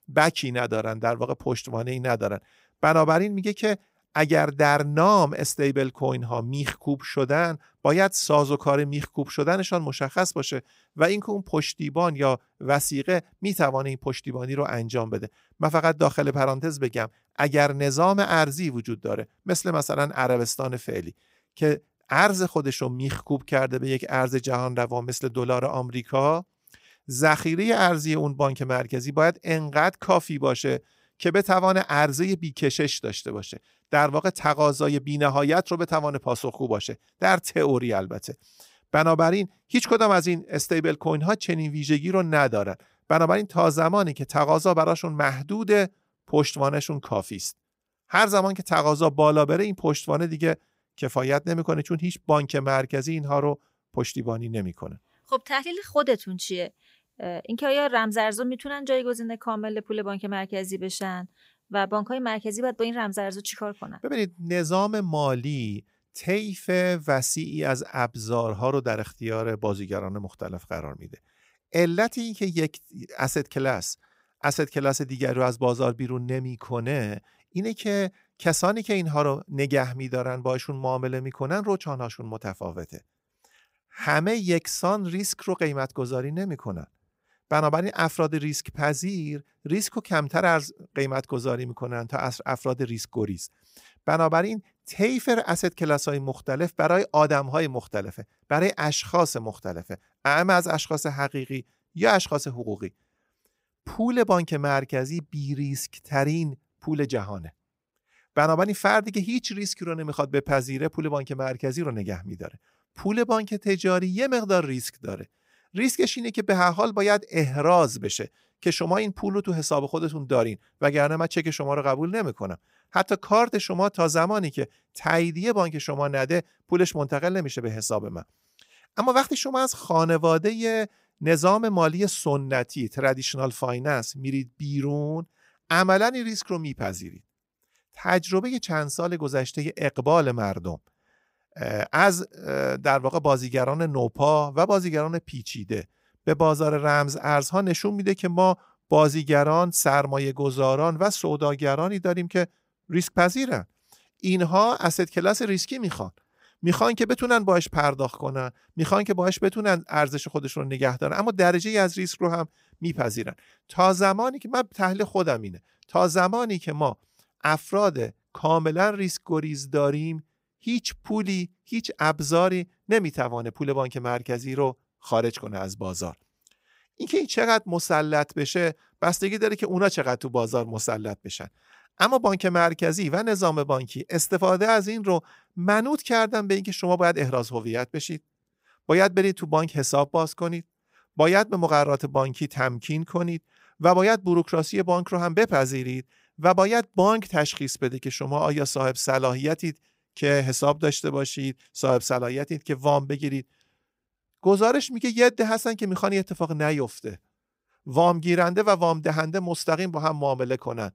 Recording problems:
none

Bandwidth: 15.5 kHz